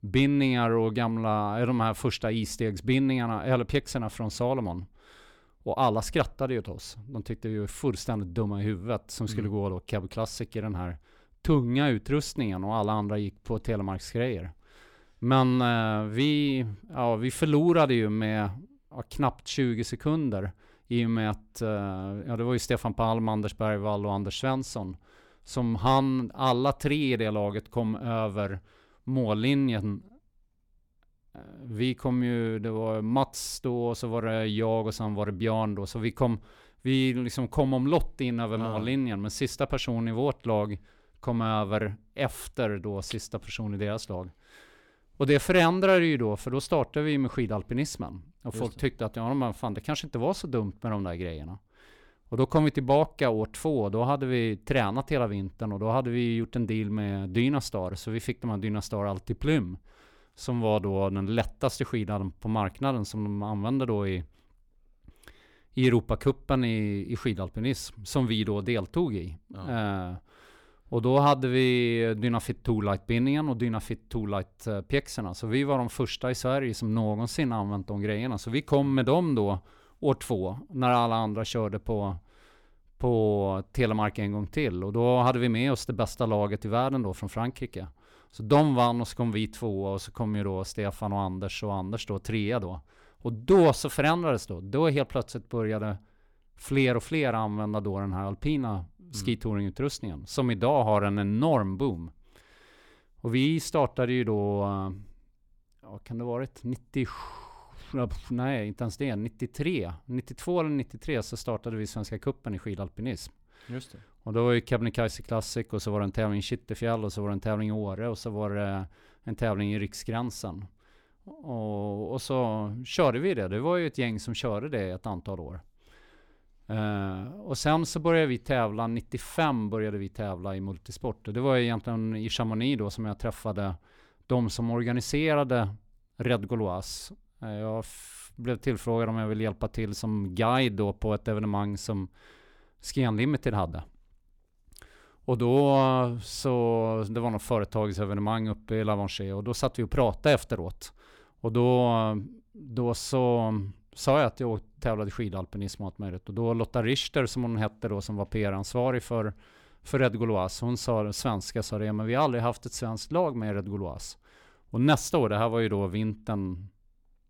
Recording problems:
none

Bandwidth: 17.5 kHz